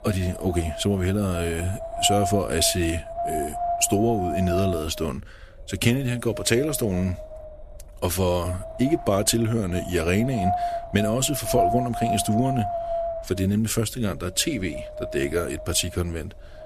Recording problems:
wind noise on the microphone; heavy; 2 dB below the speech

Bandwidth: 14.5 kHz